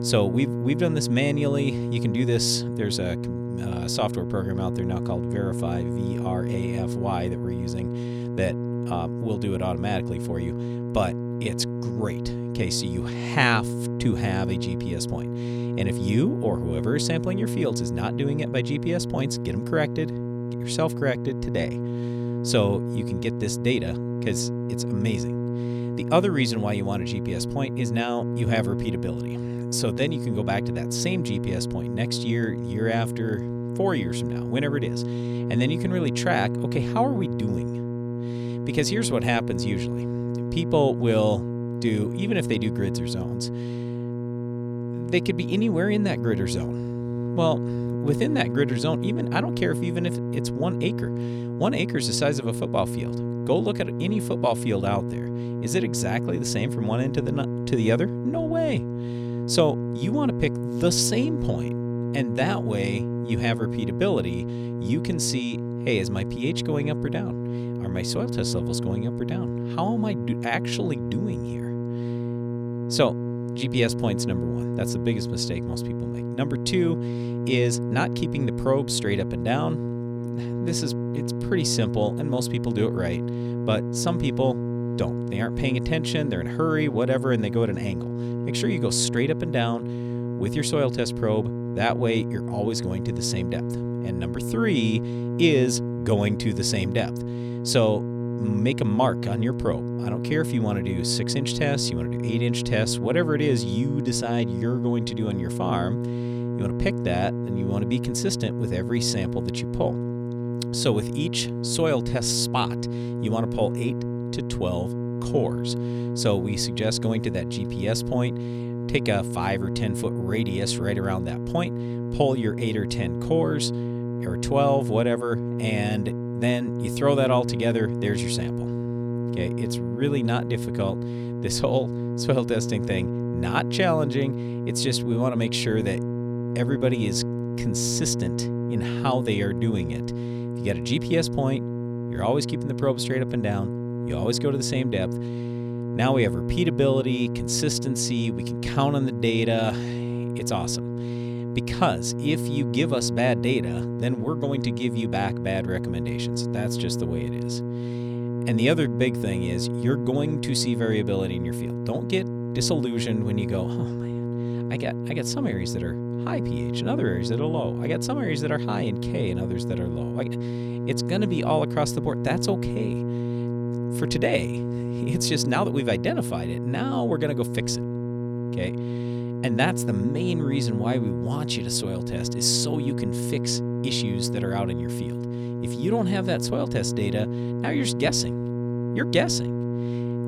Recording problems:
electrical hum; loud; throughout; 60 Hz, 6 dB below the speech

